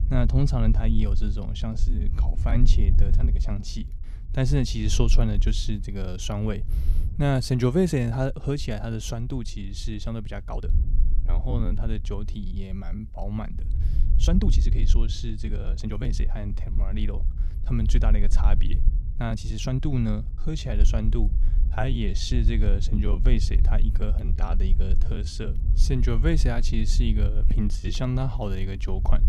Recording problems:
low rumble; noticeable; throughout; 15 dB below the speech
uneven, jittery; strongly; from 2 to 28 s

